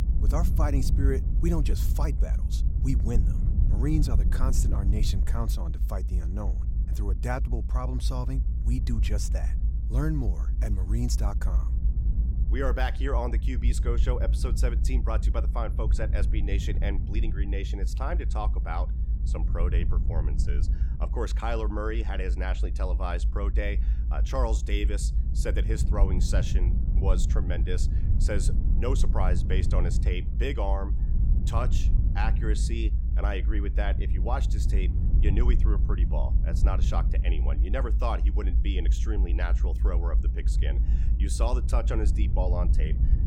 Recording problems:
low rumble; loud; throughout; 9 dB below the speech

